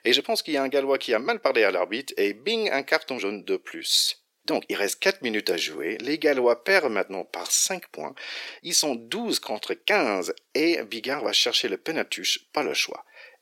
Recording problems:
thin; very; fading below 350 Hz
uneven, jittery; strongly; from 1 to 13 s

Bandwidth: 16.5 kHz